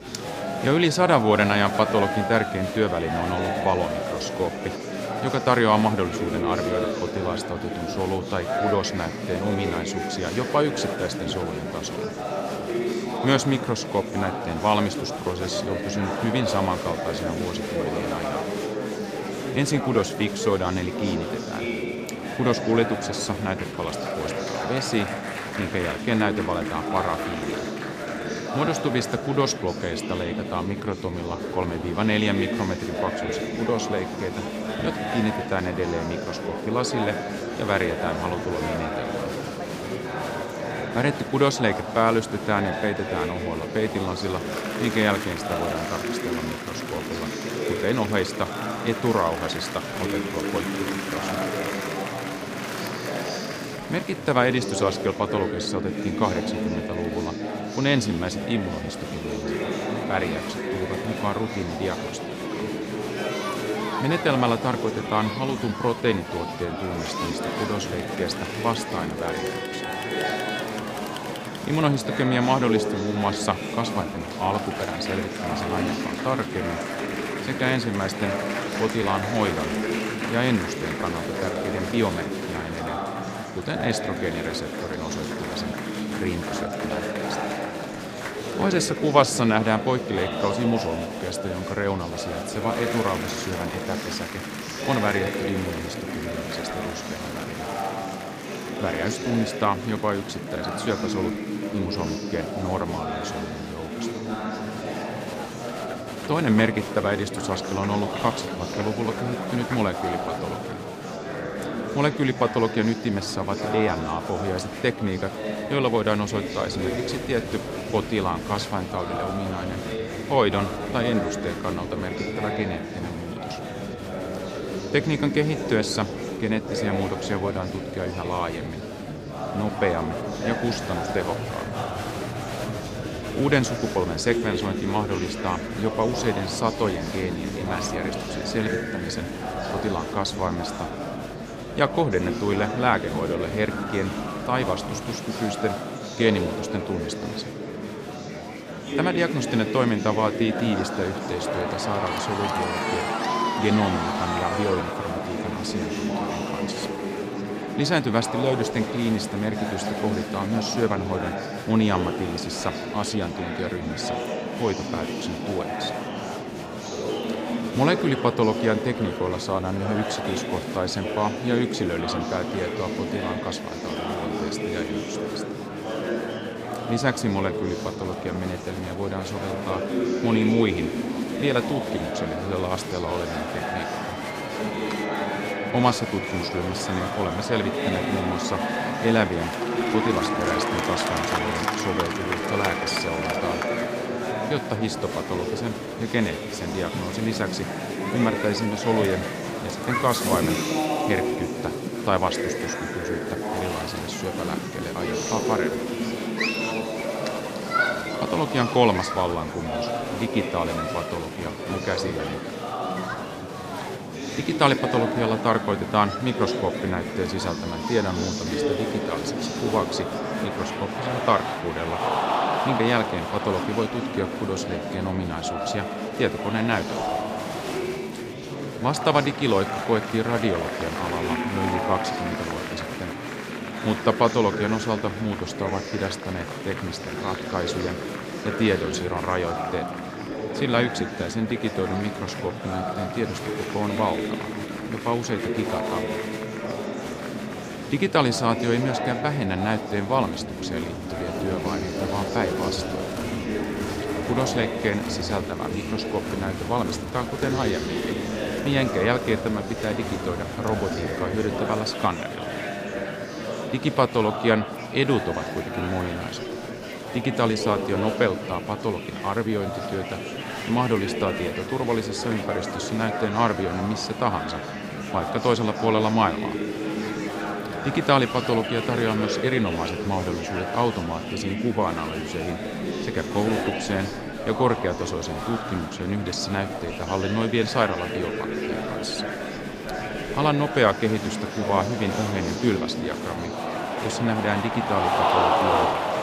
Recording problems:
murmuring crowd; loud; throughout; 3 dB below the speech

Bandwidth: 15 kHz